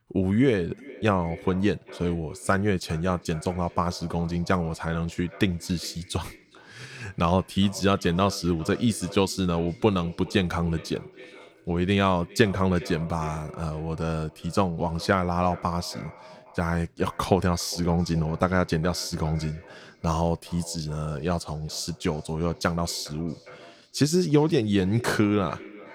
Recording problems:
echo of what is said; faint; throughout; 410 ms later, 20 dB below the speech

